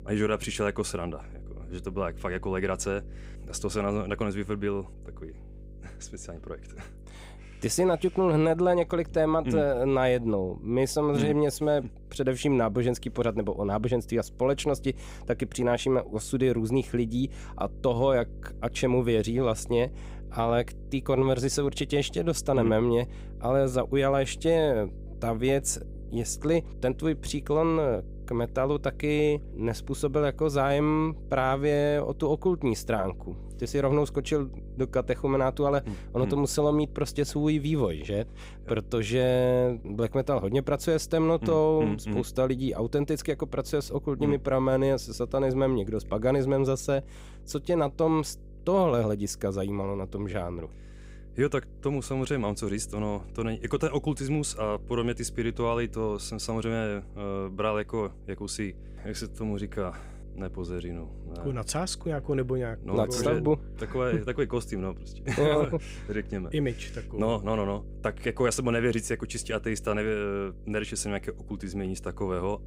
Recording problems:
electrical hum; faint; throughout; 50 Hz, 25 dB below the speech

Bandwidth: 15.5 kHz